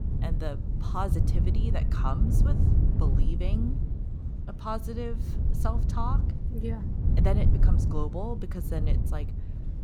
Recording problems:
wind noise on the microphone; heavy; 5 dB below the speech
murmuring crowd; faint; throughout; 25 dB below the speech

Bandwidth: 18.5 kHz